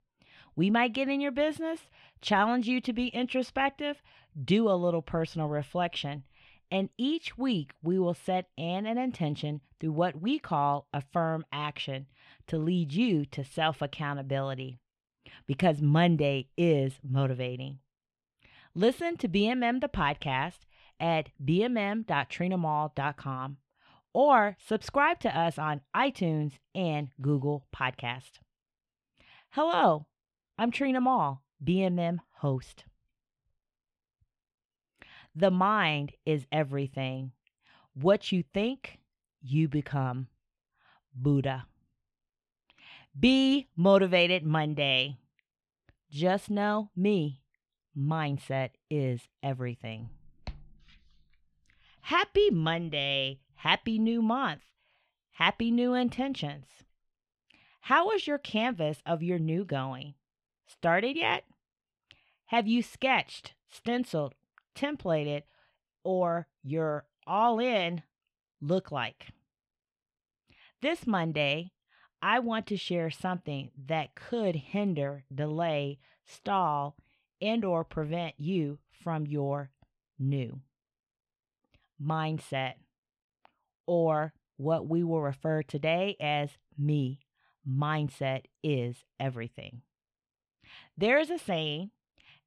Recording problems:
muffled; slightly; fading above 2.5 kHz

